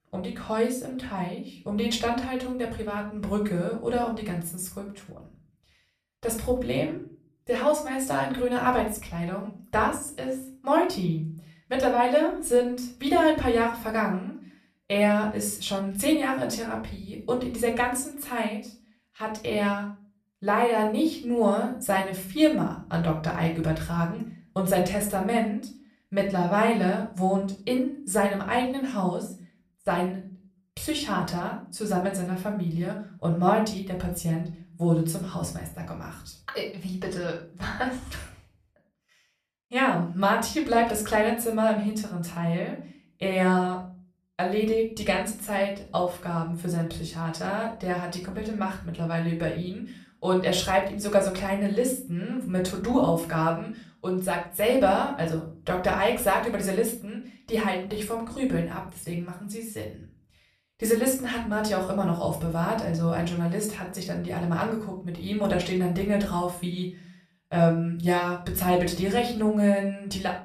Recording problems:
off-mic speech; far
room echo; slight; dies away in 0.4 s

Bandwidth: 14 kHz